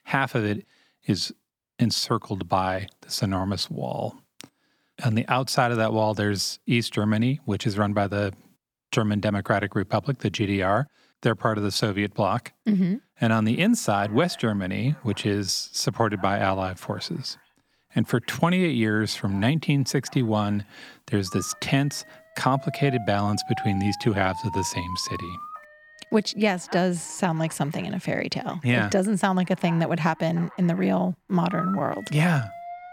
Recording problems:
alarms or sirens; noticeable; from 14 s on; 15 dB below the speech

